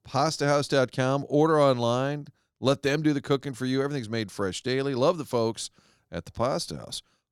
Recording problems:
none

